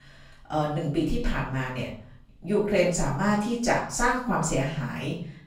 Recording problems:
off-mic speech; far
room echo; noticeable; dies away in 0.5 s

